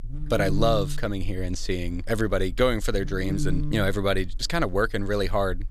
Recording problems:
electrical hum; noticeable; throughout; 50 Hz, 15 dB below the speech

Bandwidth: 14.5 kHz